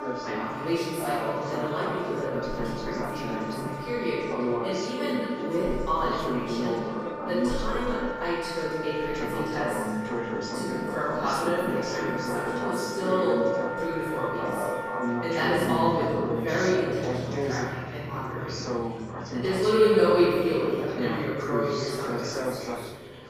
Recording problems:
room echo; strong; dies away in 1.8 s
off-mic speech; far
background music; loud; throughout; 9 dB below the speech
chatter from many people; loud; throughout; 5 dB below the speech

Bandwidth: 15 kHz